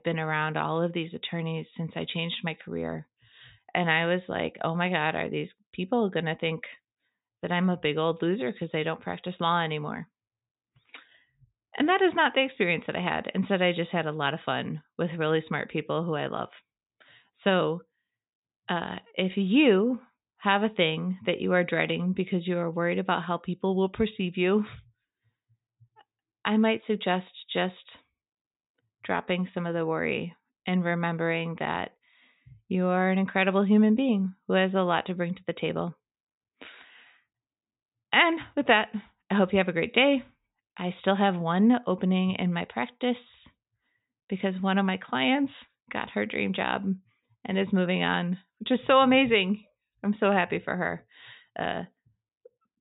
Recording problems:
high frequencies cut off; severe; nothing above 4 kHz

